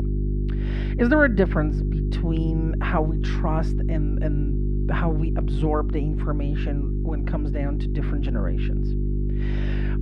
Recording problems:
muffled; slightly; fading above 2 kHz
electrical hum; loud; throughout; 50 Hz, 9 dB below the speech

